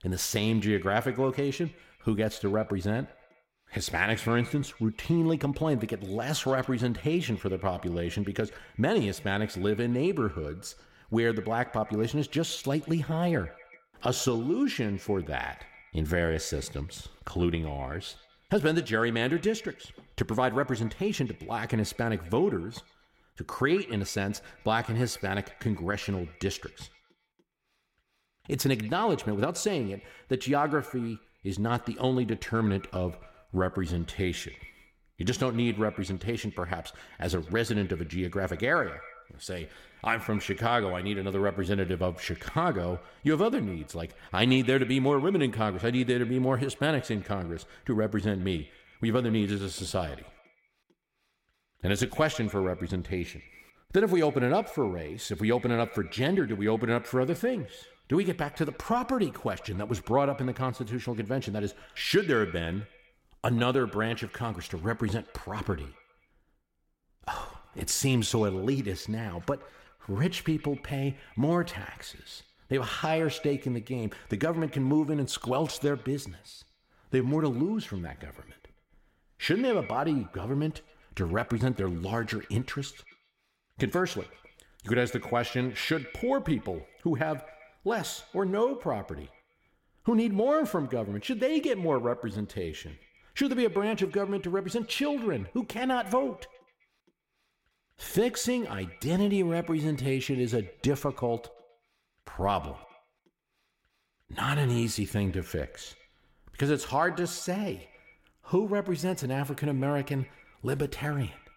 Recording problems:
echo of what is said; faint; throughout; 130 ms later, 20 dB below the speech

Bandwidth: 16.5 kHz